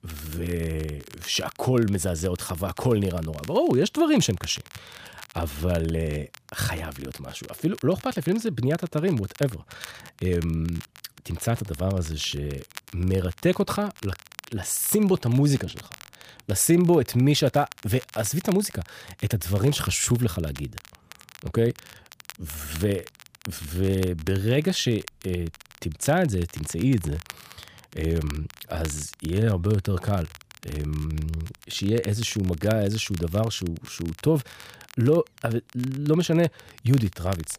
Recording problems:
crackle, like an old record; noticeable; 20 dB below the speech

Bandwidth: 15 kHz